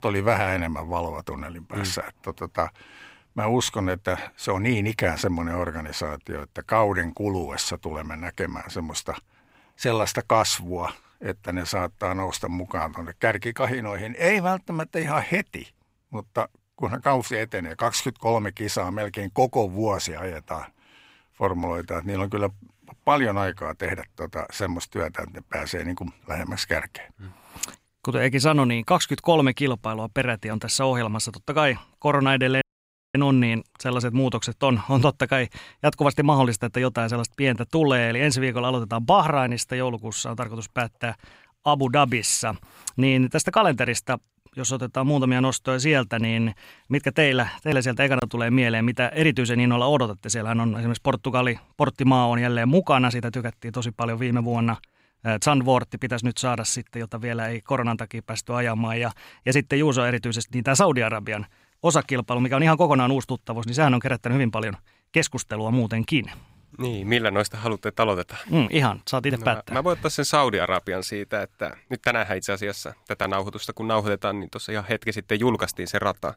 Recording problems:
audio cutting out; at 33 s for 0.5 s

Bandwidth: 15.5 kHz